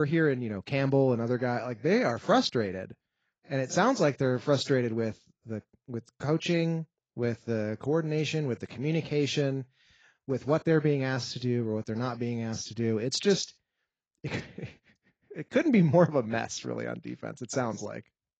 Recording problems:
garbled, watery; badly; nothing above 7.5 kHz
abrupt cut into speech; at the start

